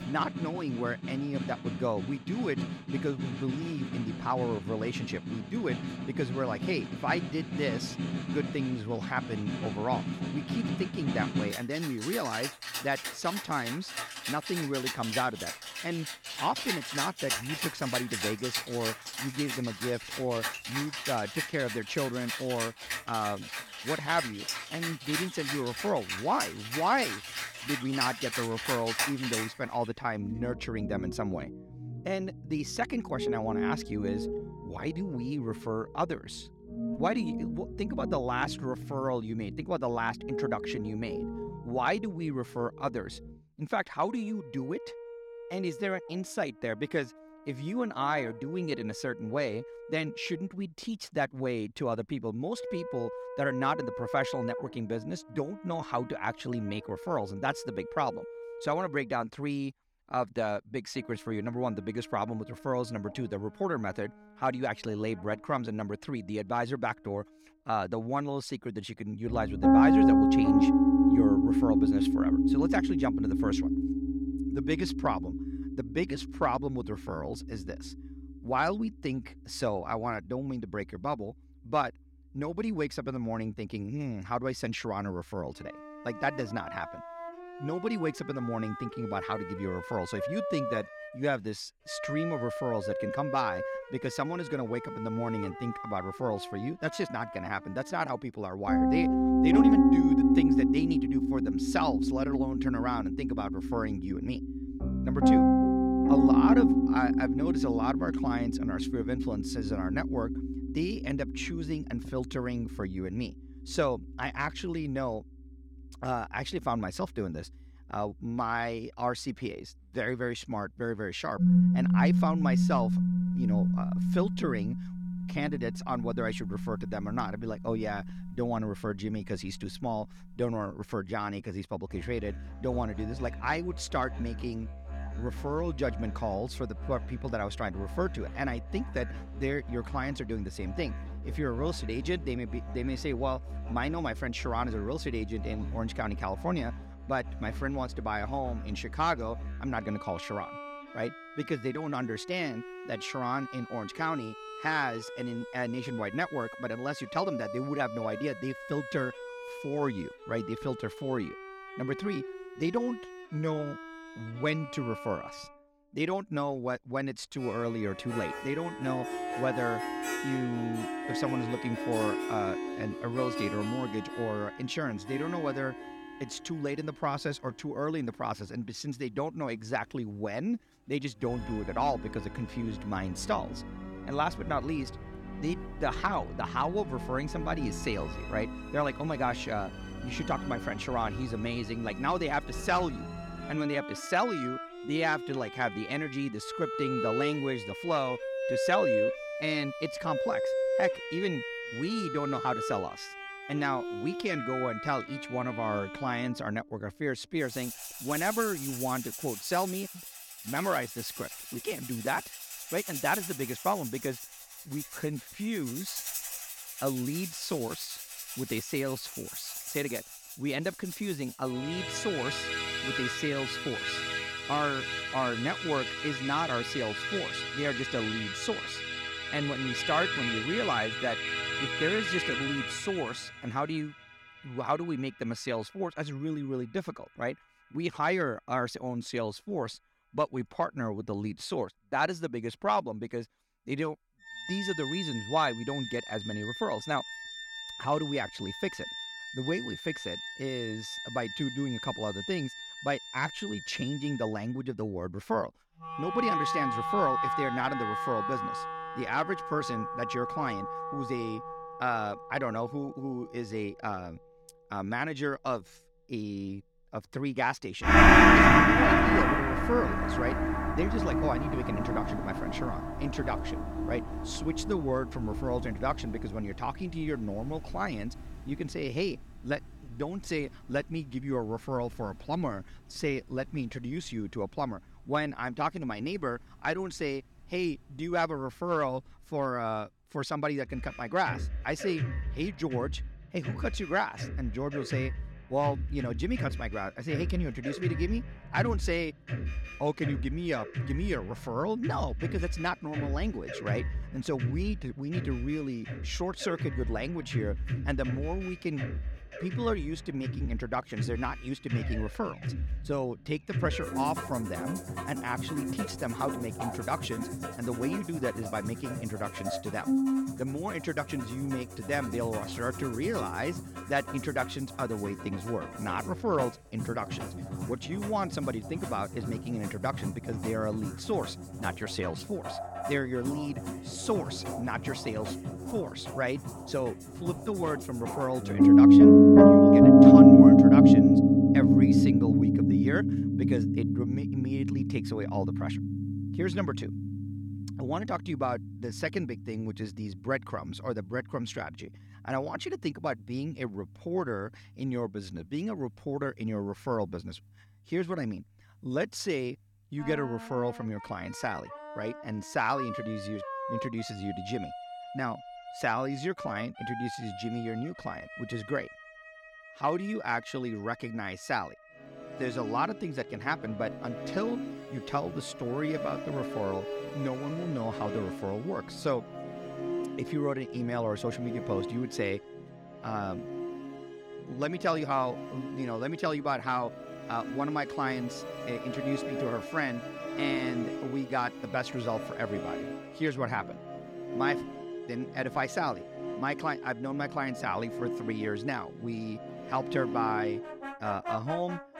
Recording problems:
background music; very loud; throughout; 5 dB above the speech

